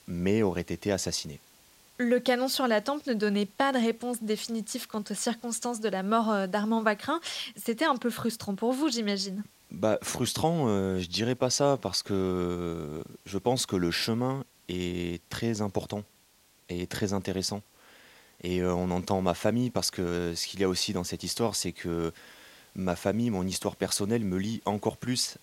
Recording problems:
hiss; faint; throughout; 30 dB below the speech

